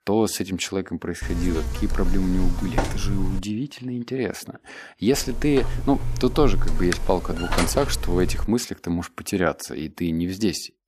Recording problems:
electrical hum; loud; from 1 to 3.5 s and from 5 to 8.5 s; 50 Hz, 6 dB below the speech

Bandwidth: 14.5 kHz